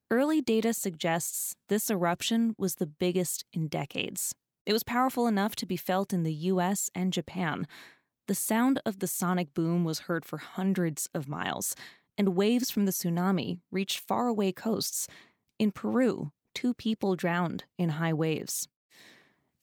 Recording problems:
none

